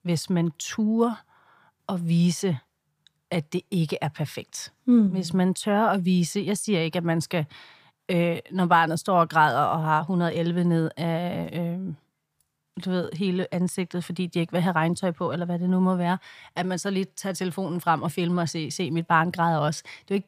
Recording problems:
none

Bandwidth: 15 kHz